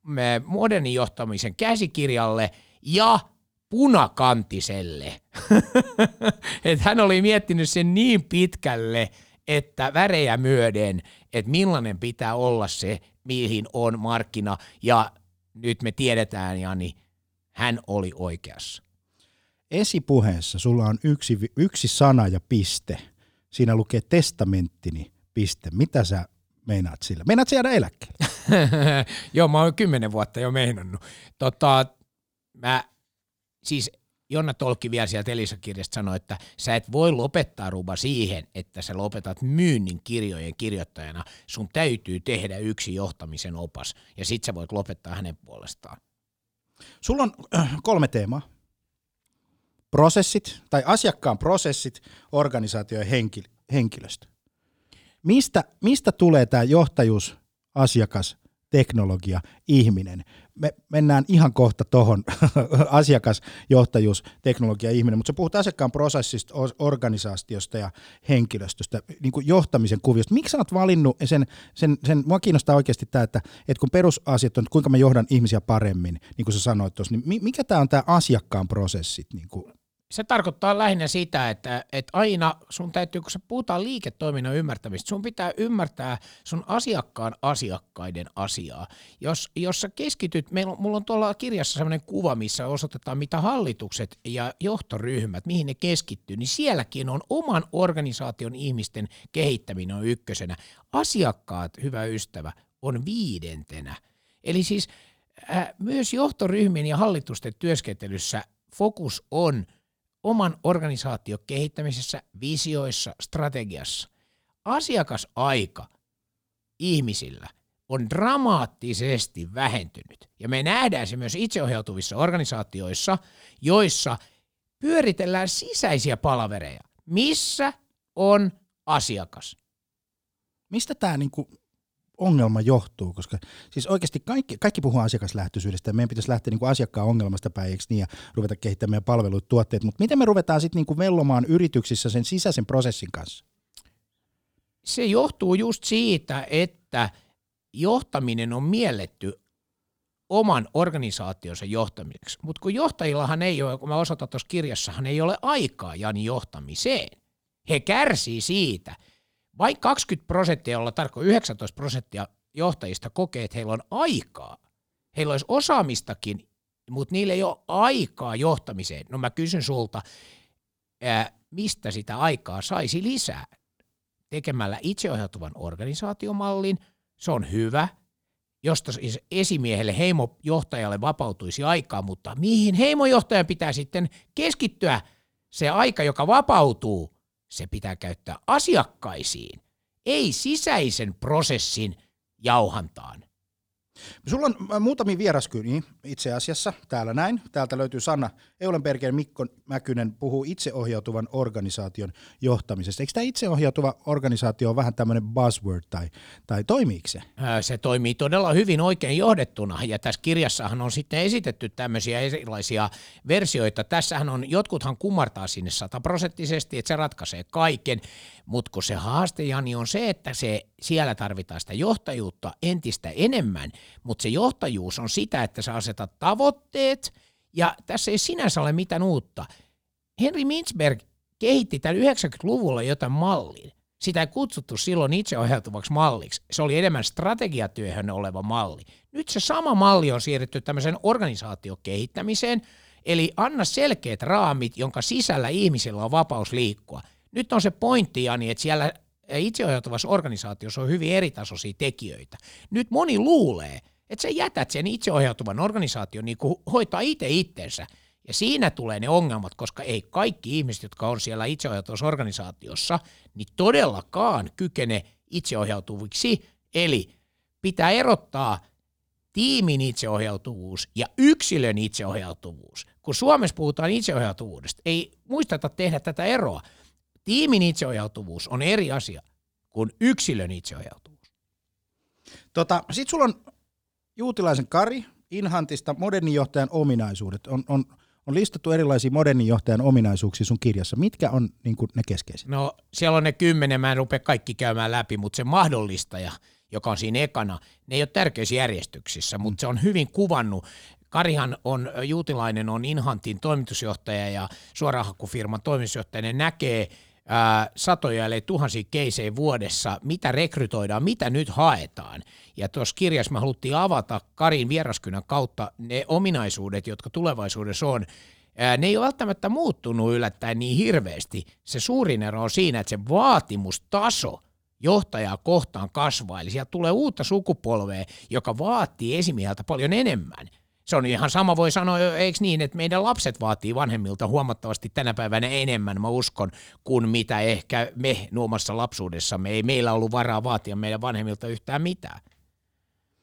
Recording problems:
none

